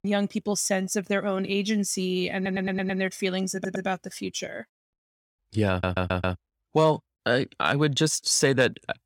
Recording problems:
audio stuttering; at 2.5 s, at 3.5 s and at 5.5 s

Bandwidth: 17 kHz